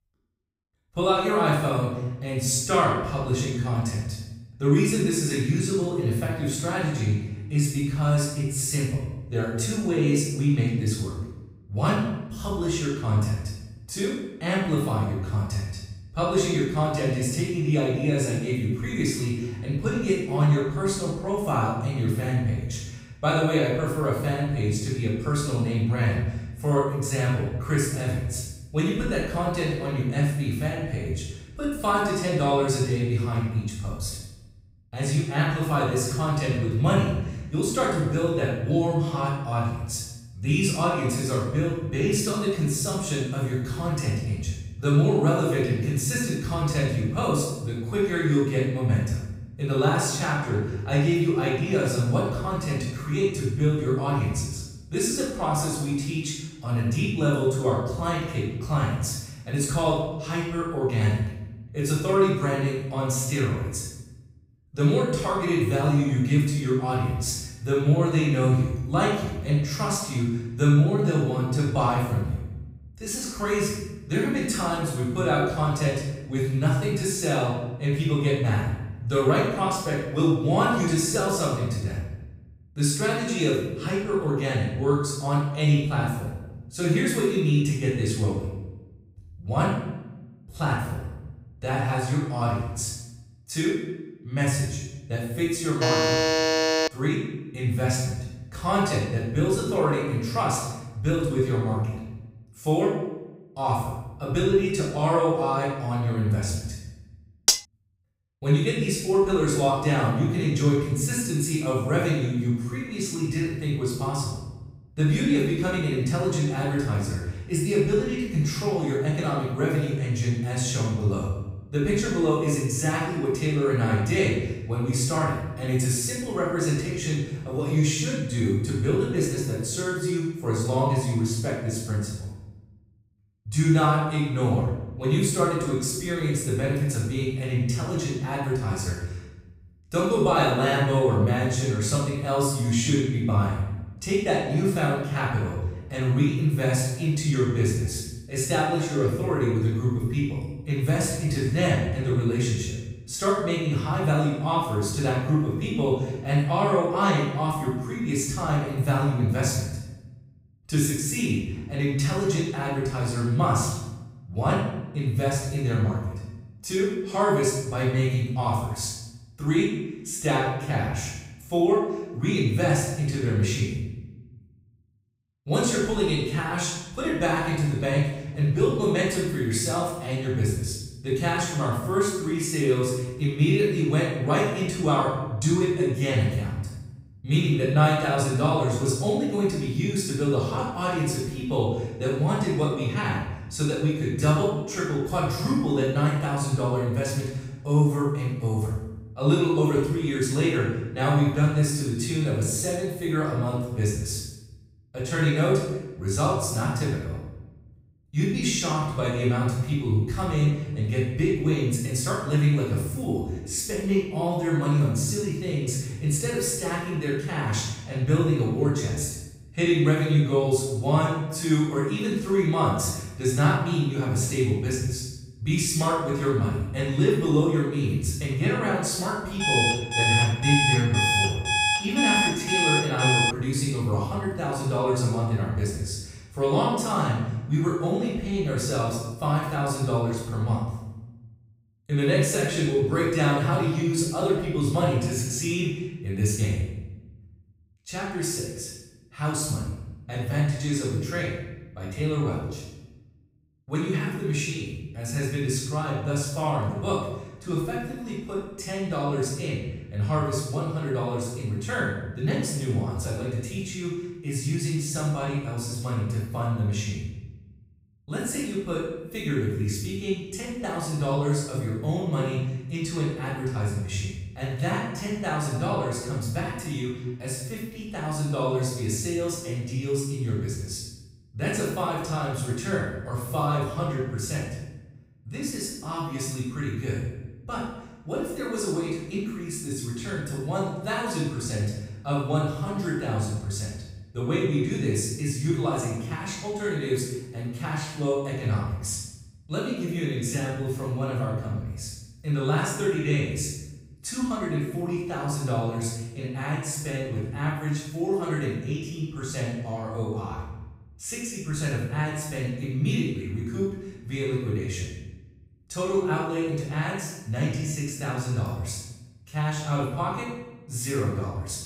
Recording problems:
room echo; strong; dies away in 0.9 s
off-mic speech; far
alarm; loud; from 1:36 to 1:37 and from 3:49 to 3:53; peak 4 dB above the speech
clattering dishes; loud; at 1:47; peak 5 dB above the speech

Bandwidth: 15.5 kHz